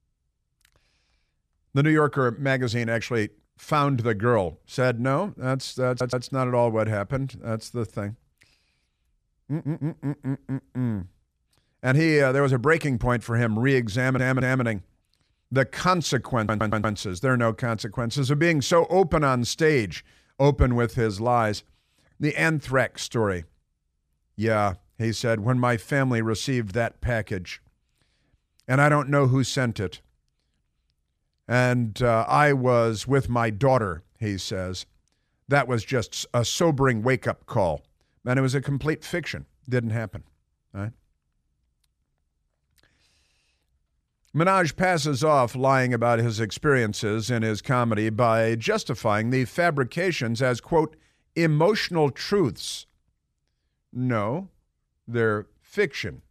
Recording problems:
audio stuttering; 4 times, first at 6 s

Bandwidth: 14.5 kHz